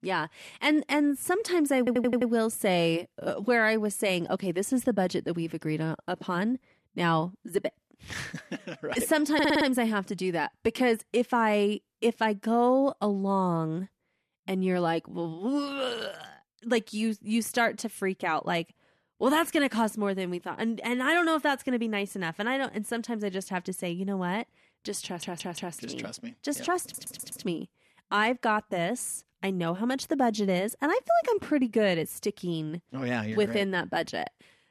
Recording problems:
audio stuttering; 4 times, first at 2 s

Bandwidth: 14.5 kHz